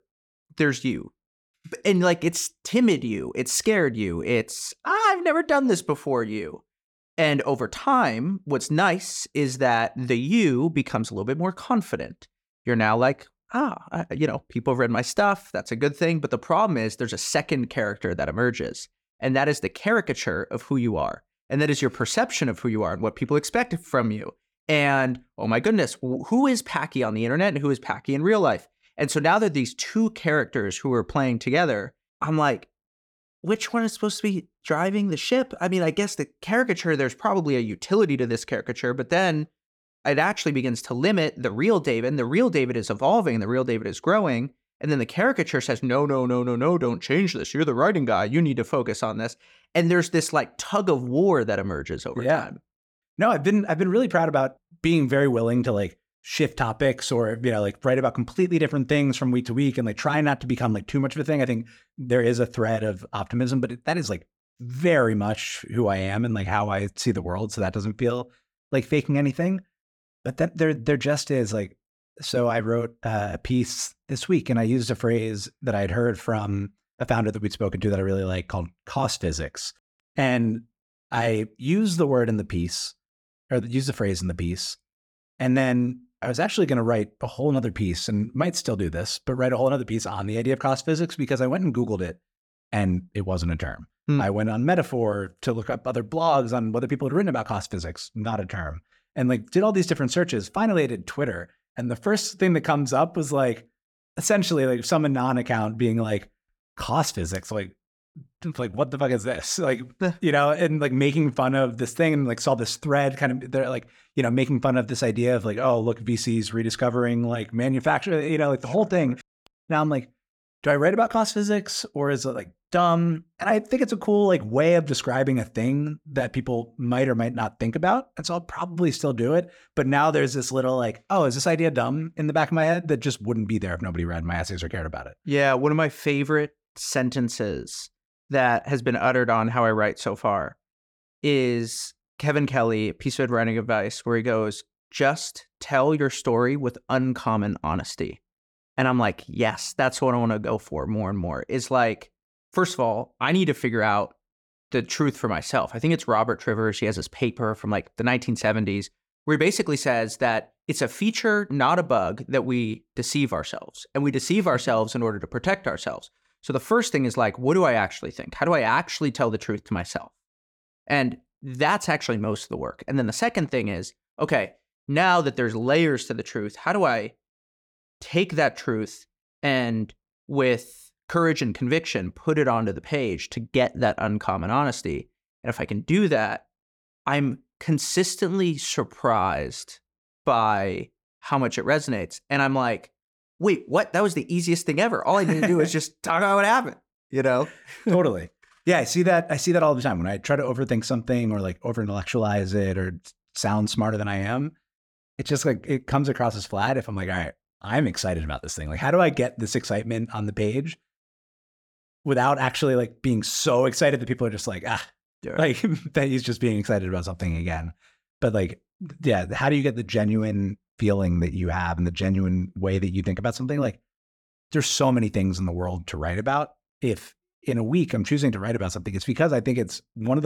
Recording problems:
abrupt cut into speech; at the end

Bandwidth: 18 kHz